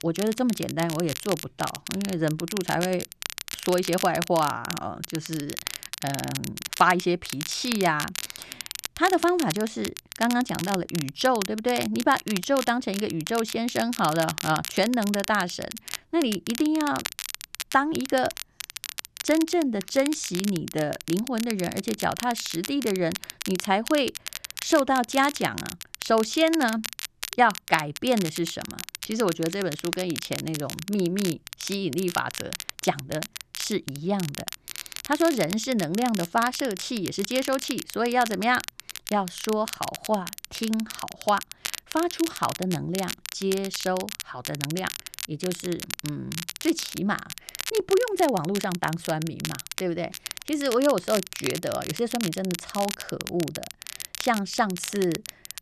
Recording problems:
crackle, like an old record; loud; 8 dB below the speech

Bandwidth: 13.5 kHz